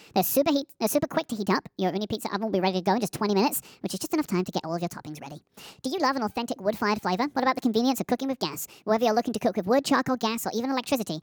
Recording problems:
wrong speed and pitch; too fast and too high; 1.5 times normal speed

